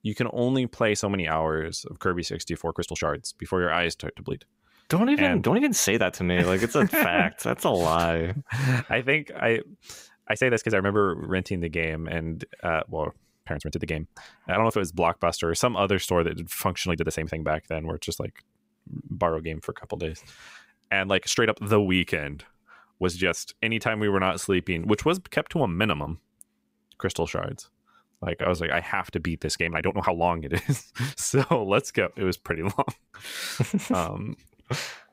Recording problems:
uneven, jittery; strongly; from 1 to 33 s

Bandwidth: 15.5 kHz